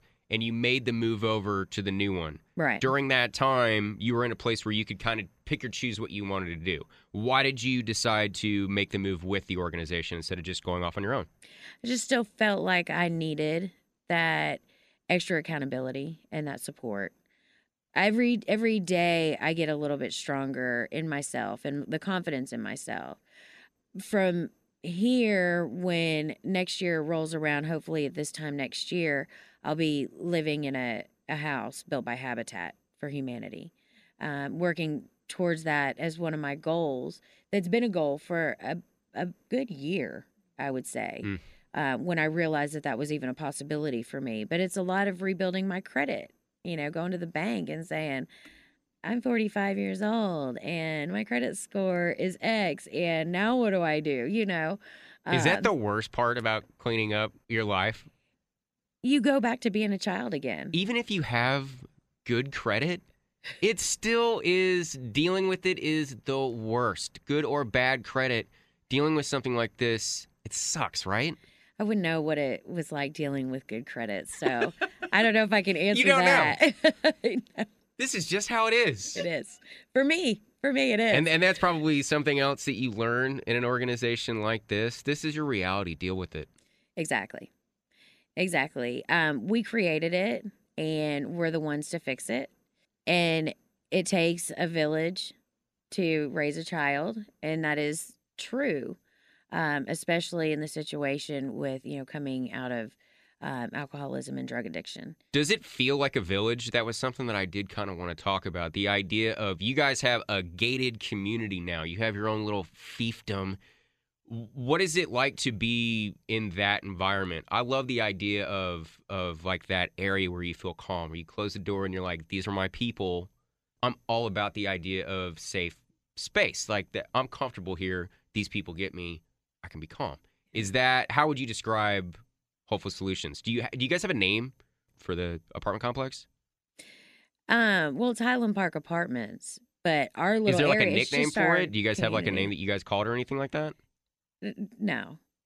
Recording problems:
none

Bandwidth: 14.5 kHz